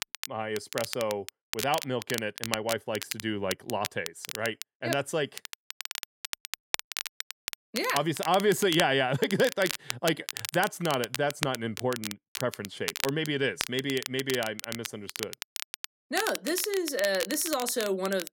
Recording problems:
crackle, like an old record; loud; 7 dB below the speech

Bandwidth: 16.5 kHz